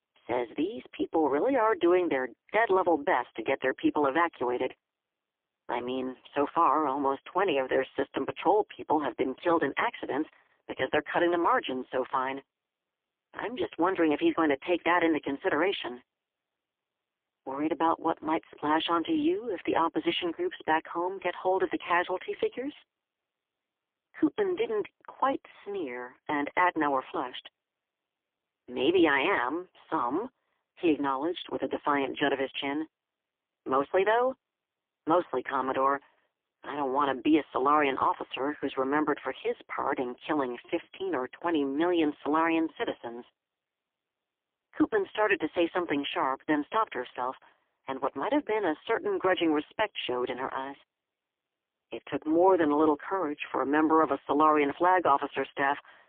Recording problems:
phone-call audio; poor line; nothing above 3.5 kHz

